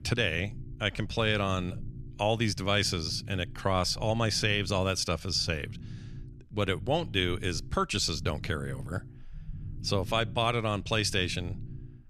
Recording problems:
low rumble; faint; throughout; 25 dB below the speech

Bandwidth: 13.5 kHz